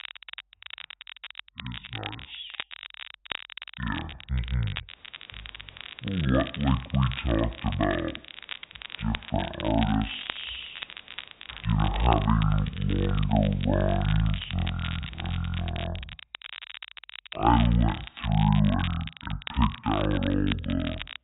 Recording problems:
high frequencies cut off; severe; nothing above 4 kHz
wrong speed and pitch; too slow and too low; 0.5 times normal speed
crackle, like an old record; noticeable; 10 dB below the speech
hiss; faint; from 5 to 16 s; 25 dB below the speech

